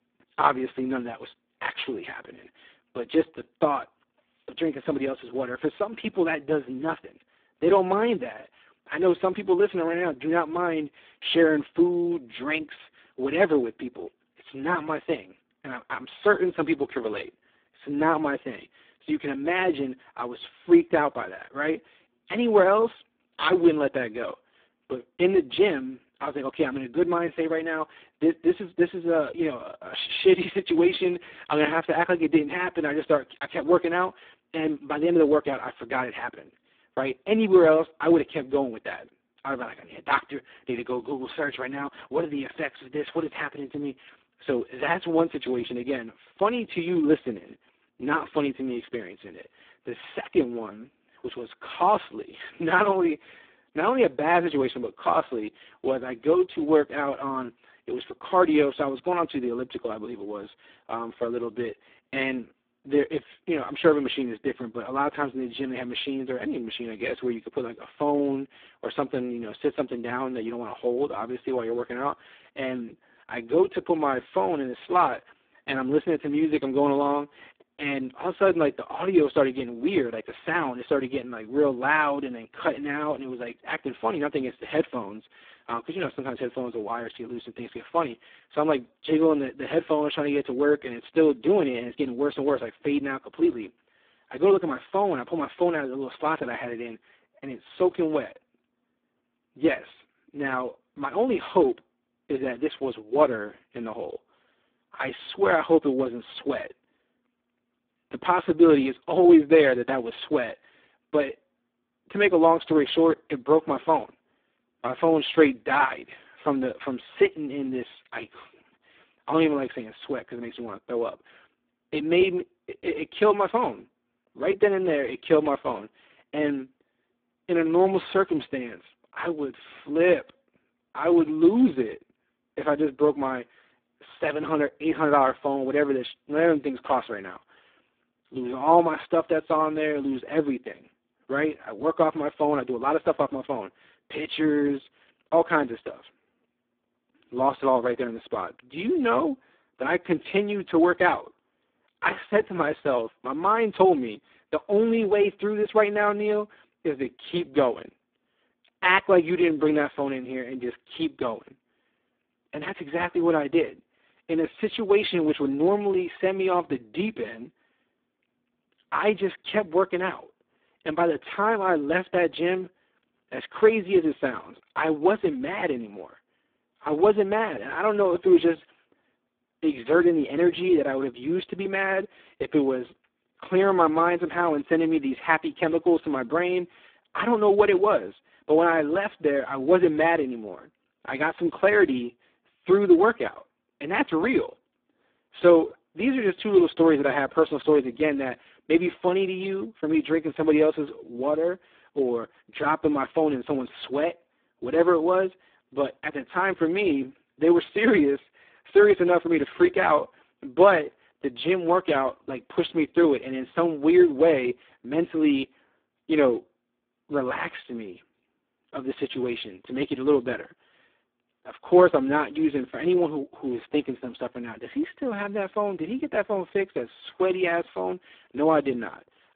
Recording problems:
phone-call audio; poor line; nothing above 3.5 kHz

